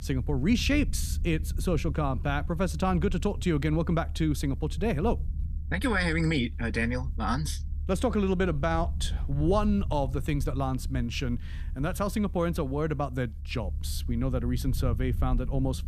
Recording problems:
low rumble; faint; throughout; 20 dB below the speech

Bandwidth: 14.5 kHz